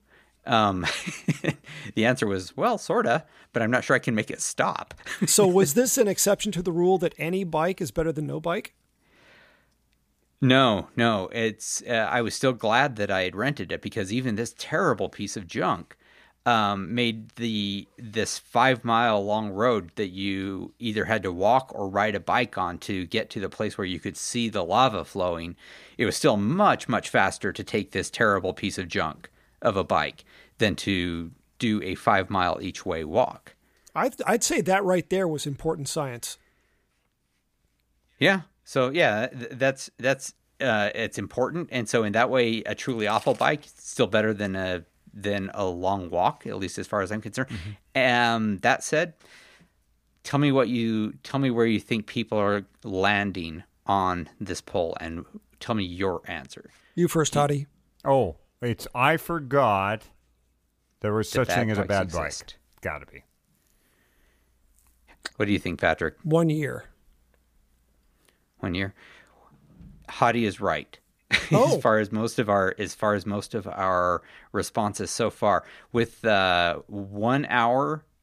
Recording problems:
none

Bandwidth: 15 kHz